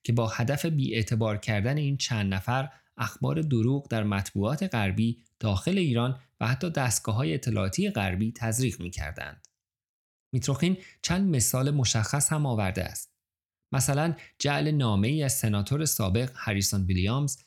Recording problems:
none

